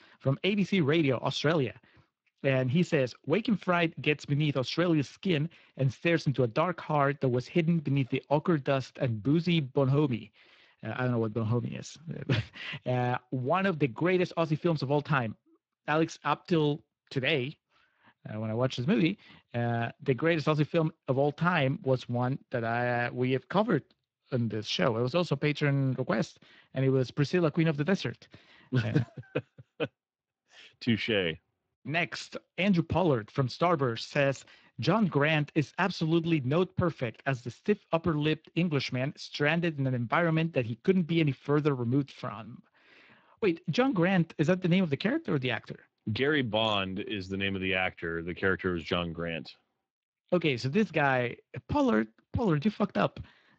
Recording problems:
garbled, watery; slightly

